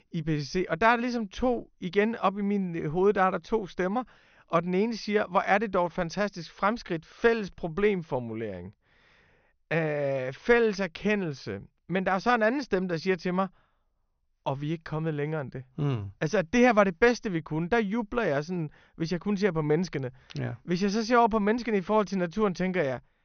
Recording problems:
high frequencies cut off; noticeable; nothing above 6.5 kHz

